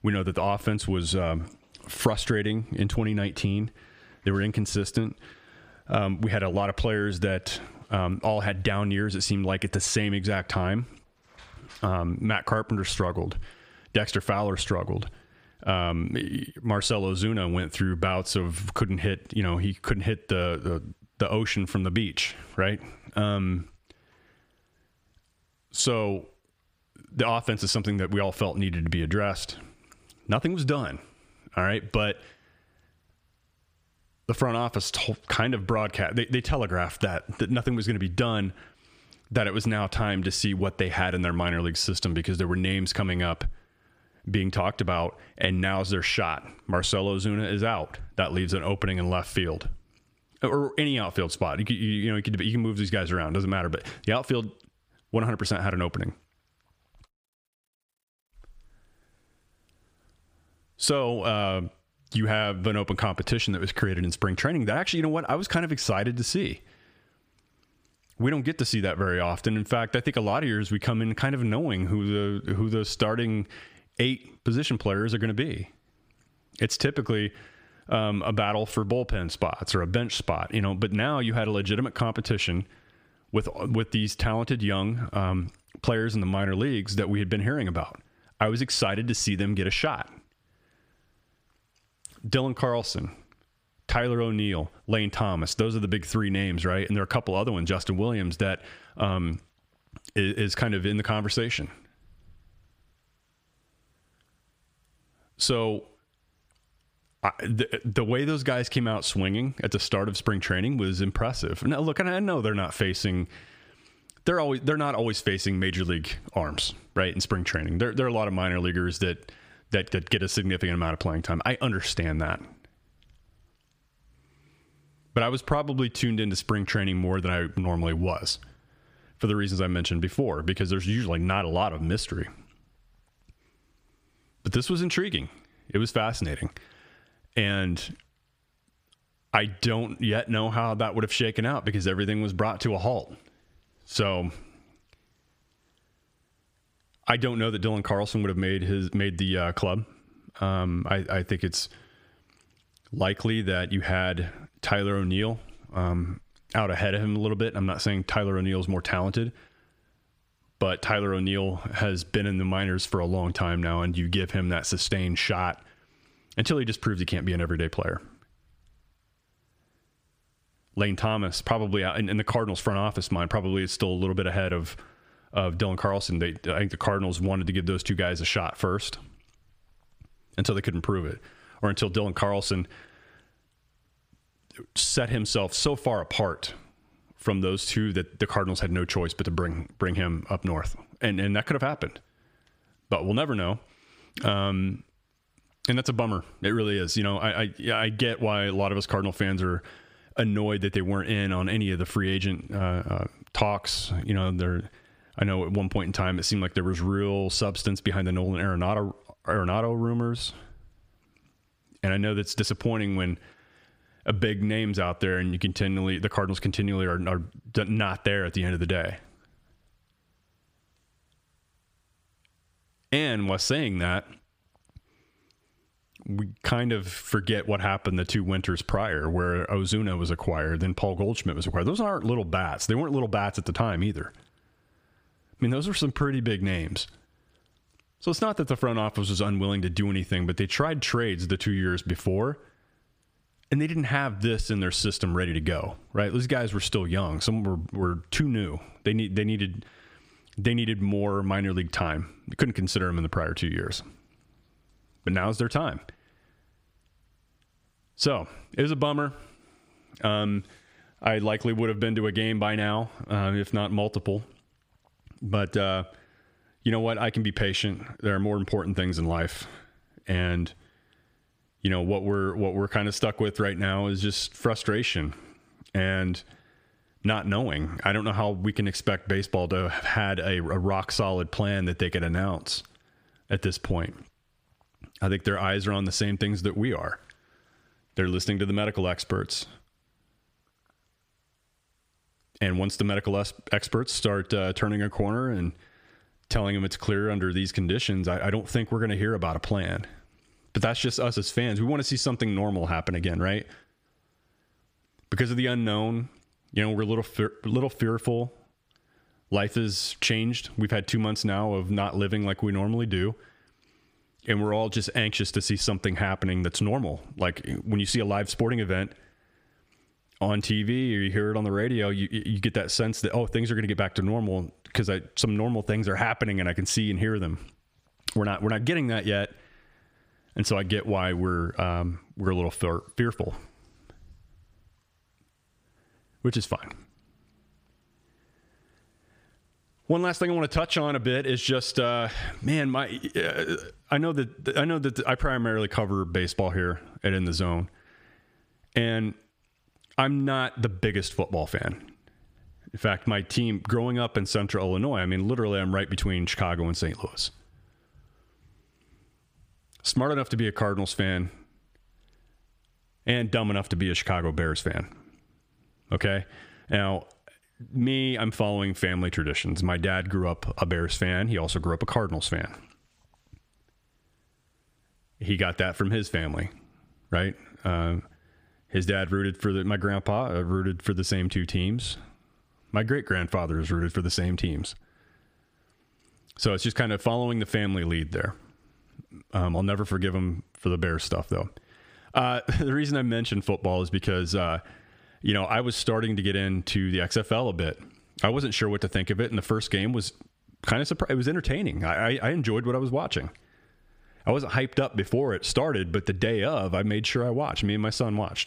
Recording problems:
squashed, flat; heavily

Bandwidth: 15 kHz